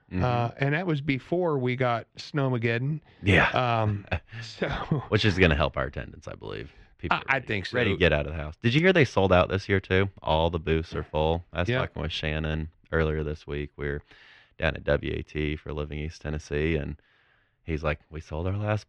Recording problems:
muffled; slightly; fading above 2.5 kHz

